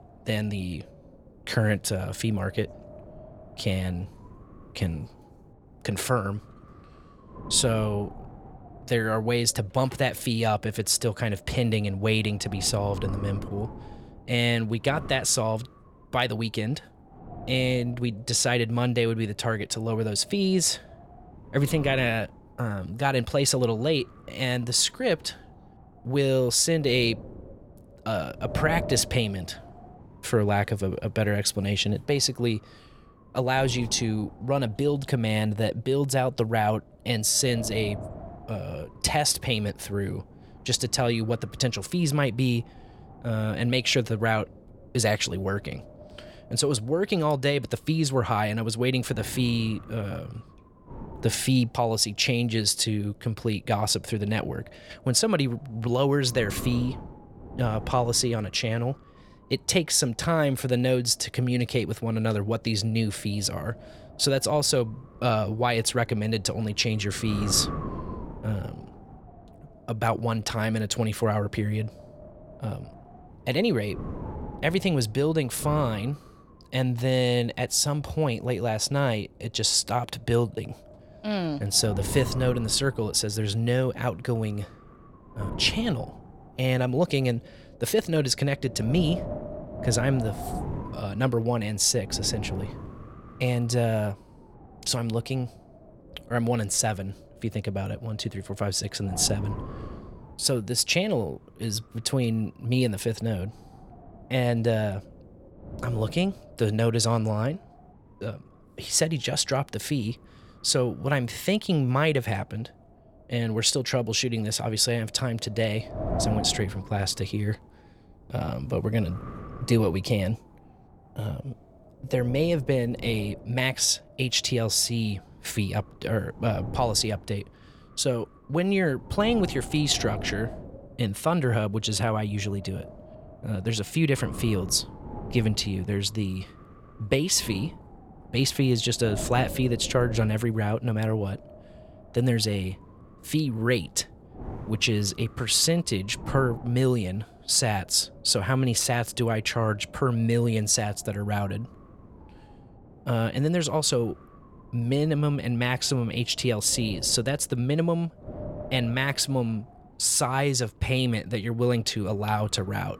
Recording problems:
wind noise on the microphone; occasional gusts; 15 dB below the speech

